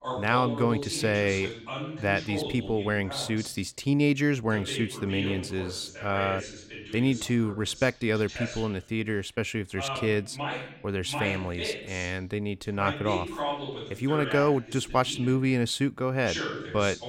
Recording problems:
voice in the background; loud; throughout; 8 dB below the speech

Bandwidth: 16 kHz